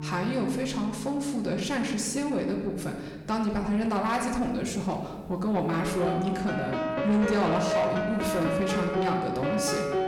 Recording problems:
room echo; slight; dies away in 1.1 s
distortion; slight; 10 dB below the speech
off-mic speech; somewhat distant
background music; loud; throughout; 2 dB below the speech

